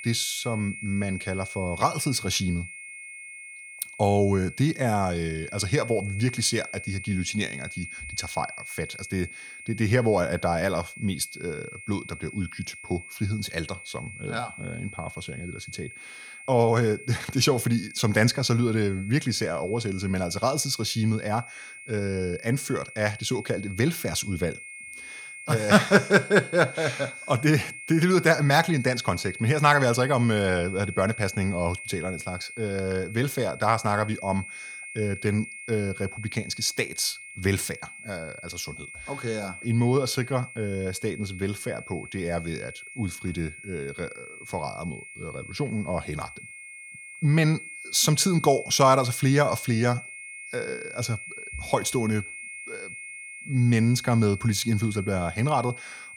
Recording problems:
high-pitched whine; noticeable; throughout; 2 kHz, 15 dB below the speech

